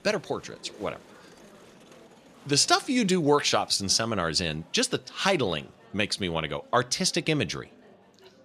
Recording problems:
murmuring crowd; faint; throughout; 25 dB below the speech

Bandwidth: 14 kHz